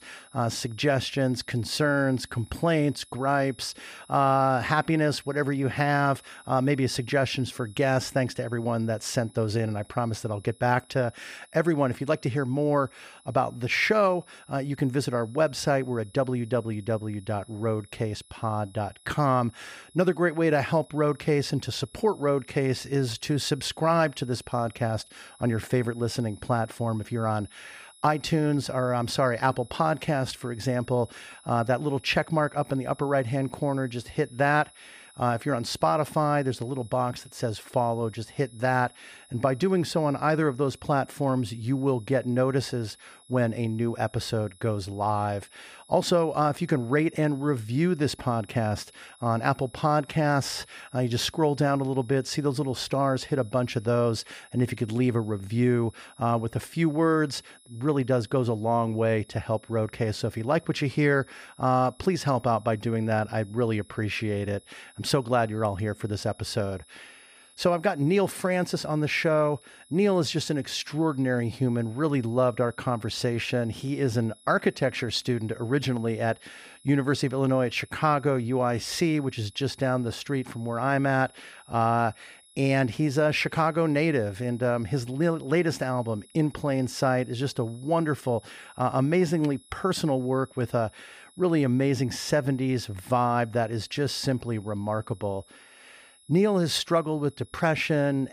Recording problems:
high-pitched whine; faint; throughout; 11 kHz, 25 dB below the speech

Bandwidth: 15 kHz